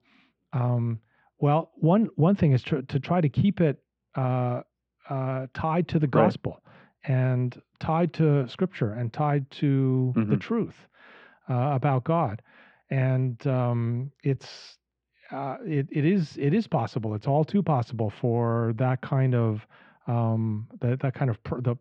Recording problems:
muffled; very; fading above 3 kHz

